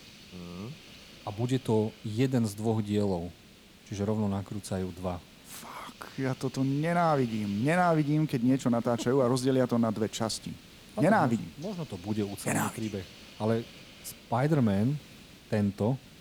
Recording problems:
hiss; faint; throughout; 20 dB below the speech

